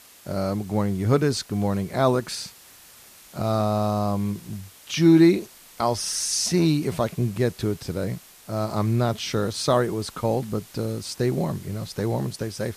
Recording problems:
hiss; faint; throughout; 20 dB below the speech

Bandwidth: 14.5 kHz